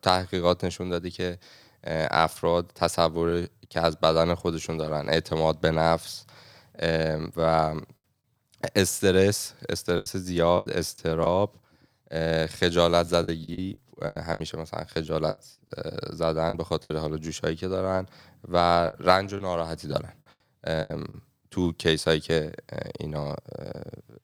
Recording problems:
choppy; very; from 10 to 11 s, from 13 to 17 s and from 19 to 21 s; 10% of the speech affected

